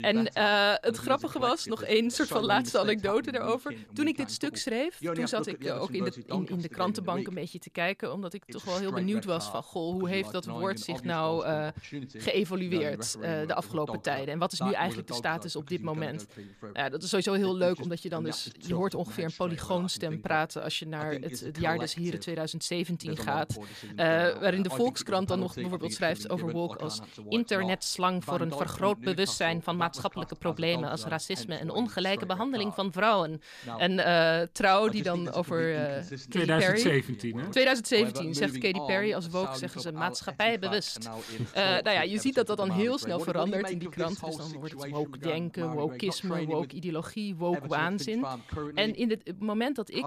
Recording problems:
voice in the background; noticeable; throughout; 10 dB below the speech

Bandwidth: 14.5 kHz